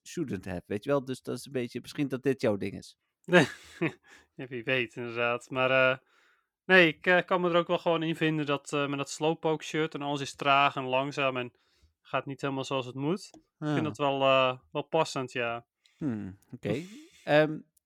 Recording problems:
none

